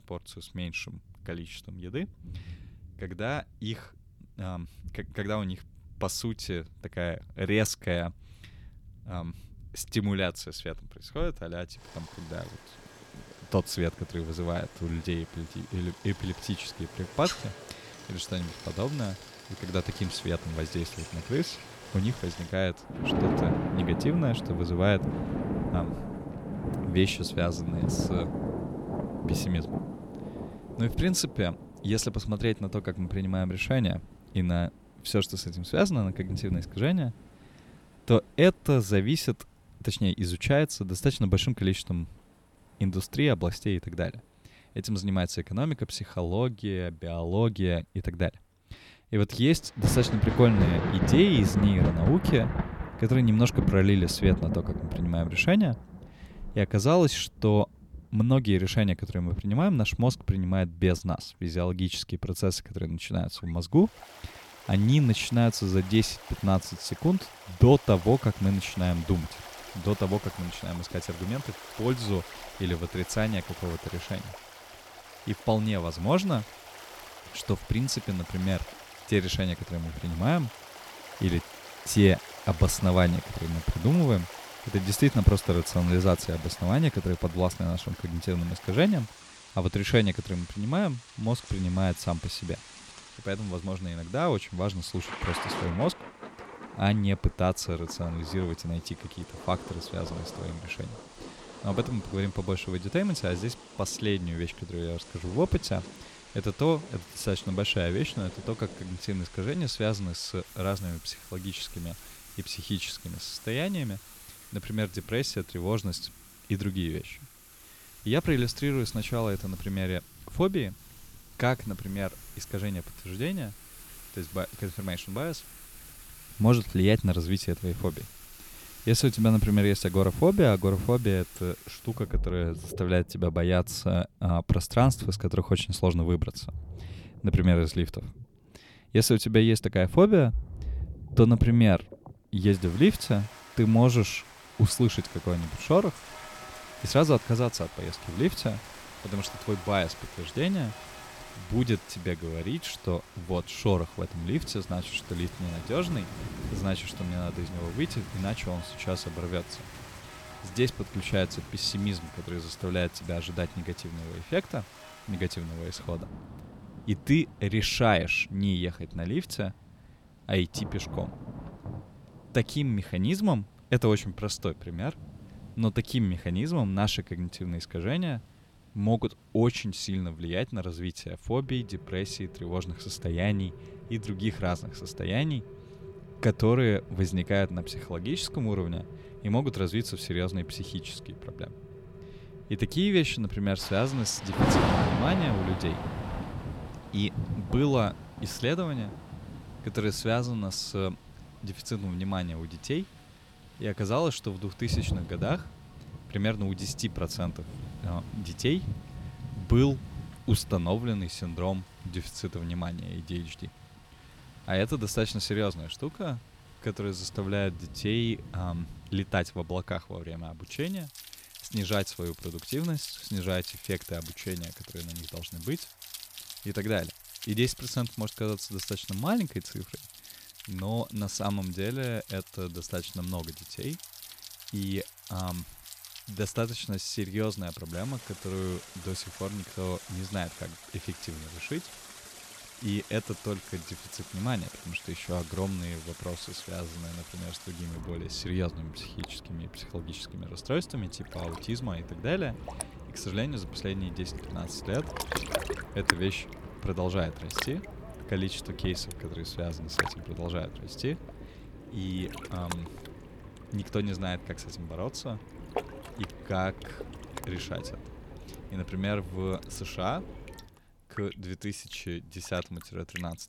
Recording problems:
rain or running water; noticeable; throughout; 10 dB below the speech

